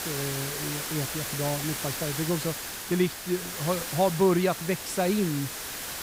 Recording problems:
hiss; loud; throughout; 4 dB below the speech

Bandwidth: 15.5 kHz